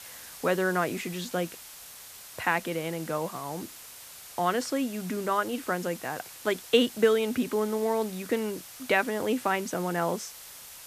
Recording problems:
hiss; noticeable; throughout; 15 dB below the speech

